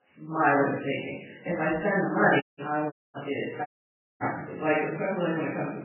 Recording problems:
off-mic speech; far
garbled, watery; badly; nothing above 3 kHz
room echo; noticeable; dies away in 0.7 s
audio cutting out; at 2.5 s, at 3 s and at 3.5 s for 0.5 s

